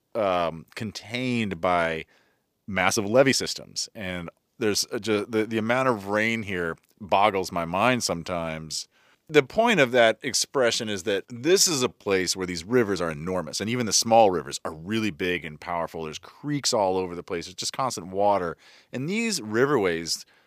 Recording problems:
uneven, jittery; strongly; from 1 to 18 s

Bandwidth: 15 kHz